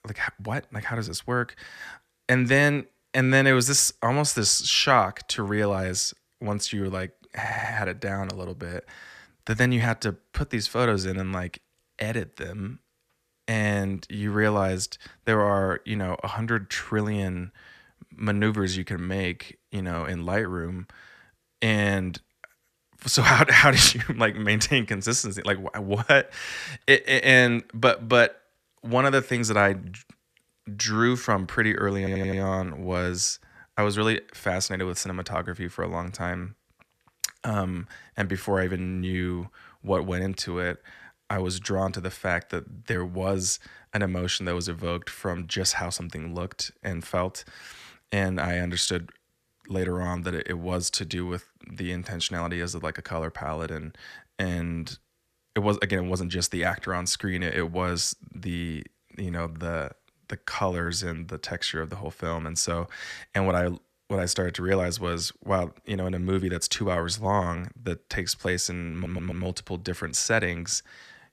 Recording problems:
audio stuttering; at 7.5 s, at 32 s and at 1:09

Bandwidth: 14.5 kHz